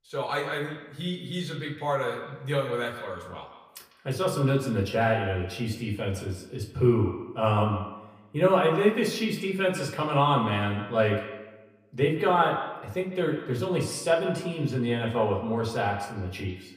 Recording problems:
echo of what is said; strong; throughout; 150 ms later, 10 dB below the speech
off-mic speech; far
room echo; very slight; dies away in 0.3 s

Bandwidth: 15 kHz